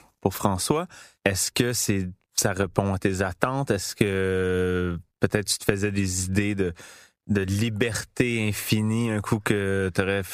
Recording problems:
squashed, flat; somewhat

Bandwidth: 15 kHz